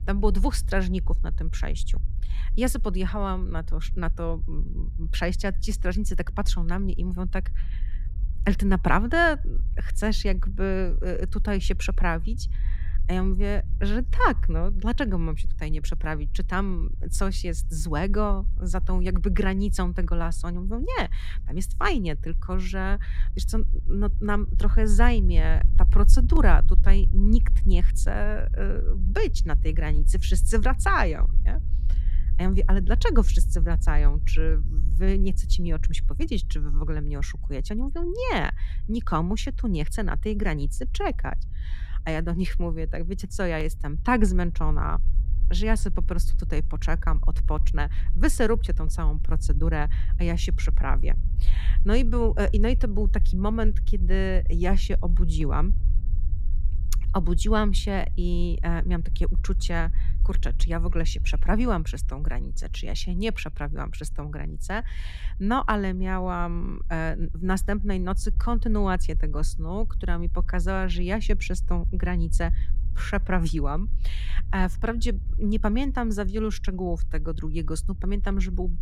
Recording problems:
low rumble; noticeable; throughout; 20 dB below the speech

